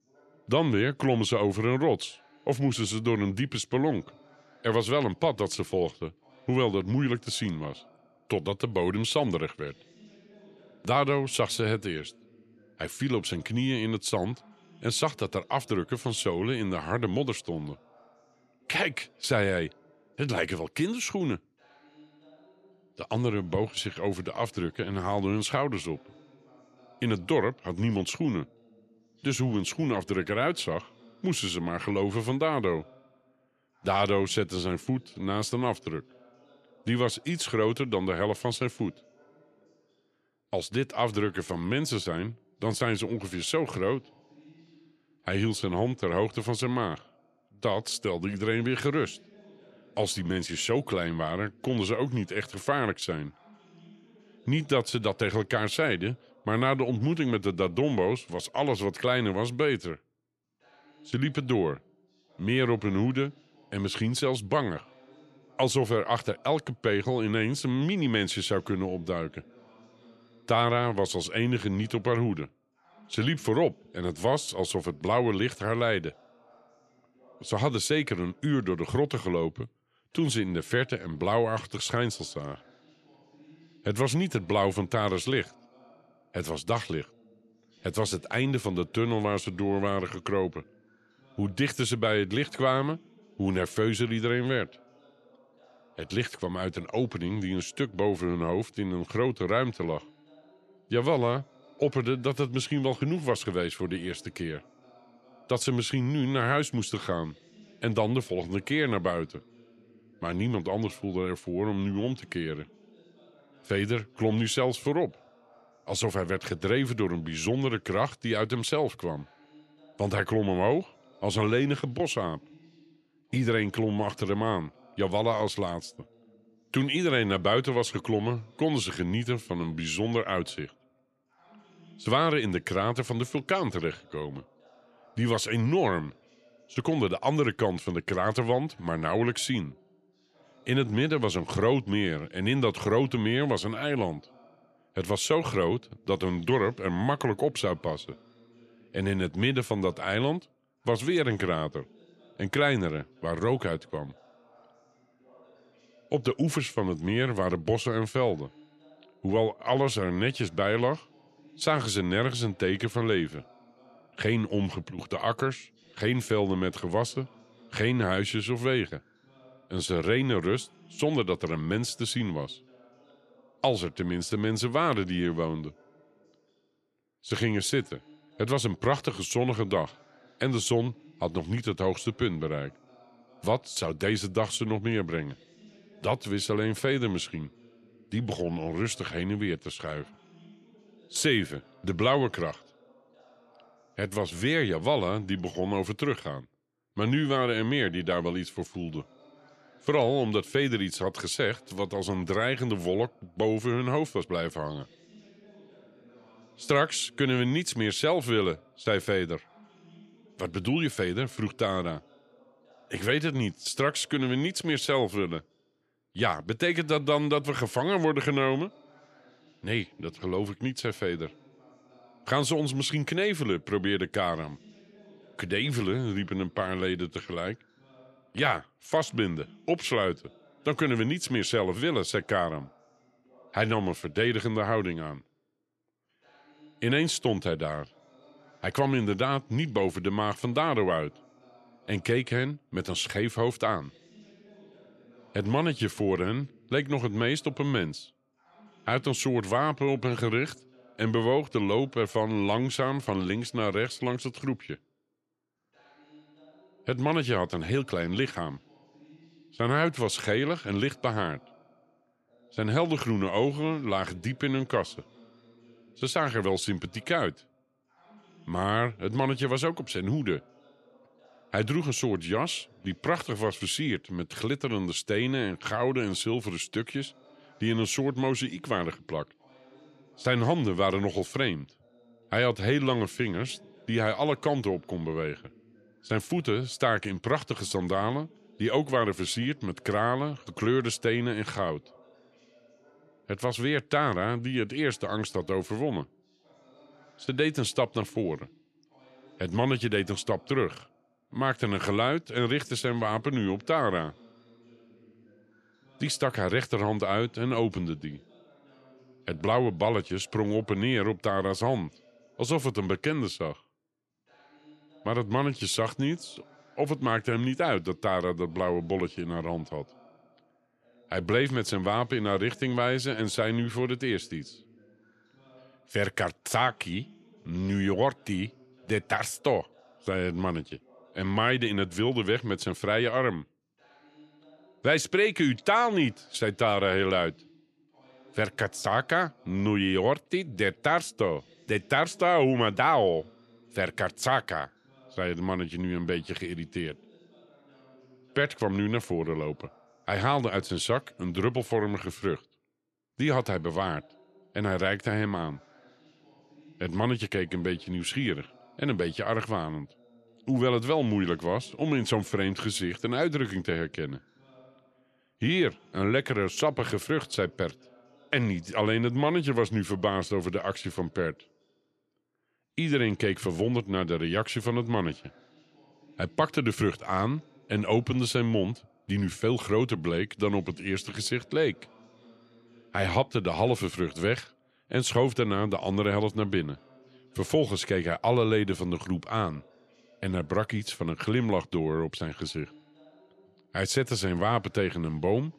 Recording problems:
voice in the background; faint; throughout; 30 dB below the speech

